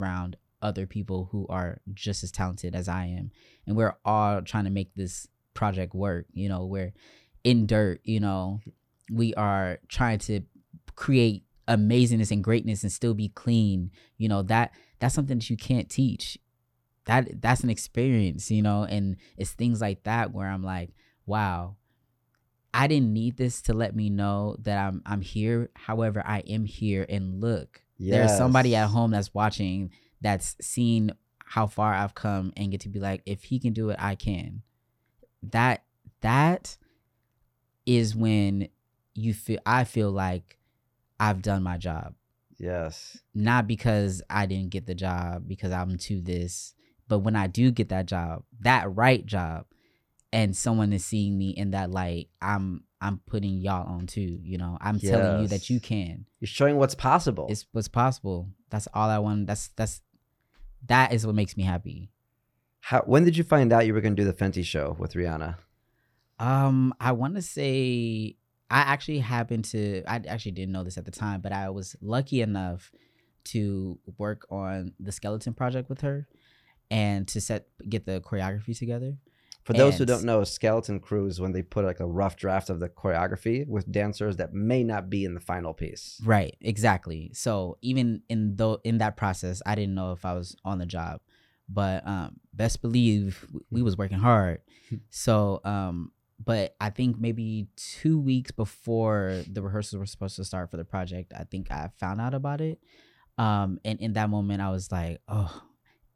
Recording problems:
abrupt cut into speech; at the start

